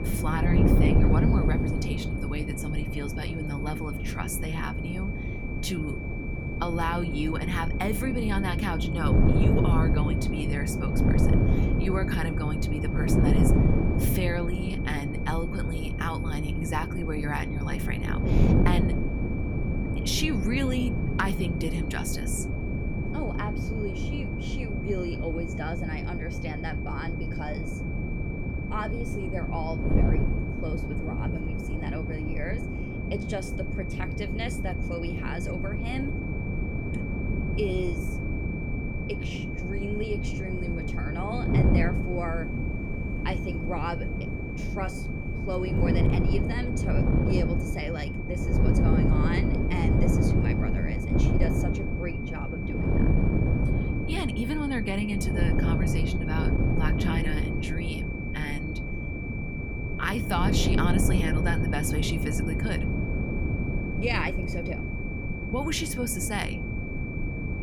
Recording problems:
wind noise on the microphone; heavy; 2 dB below the speech
high-pitched whine; loud; throughout; 2.5 kHz, 7 dB below the speech
rain or running water; faint; until 46 s; 25 dB below the speech

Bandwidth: 18.5 kHz